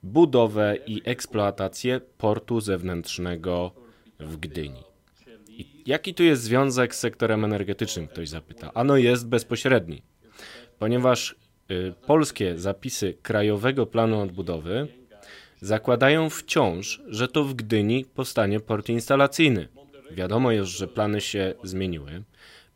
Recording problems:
voice in the background; faint; throughout; 30 dB below the speech

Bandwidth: 16 kHz